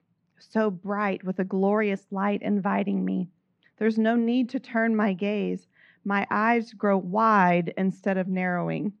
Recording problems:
muffled; very; fading above 2.5 kHz

